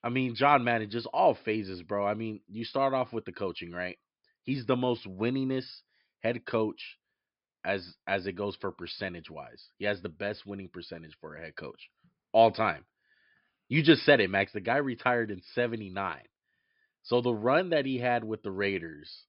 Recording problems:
high frequencies cut off; noticeable; nothing above 5.5 kHz

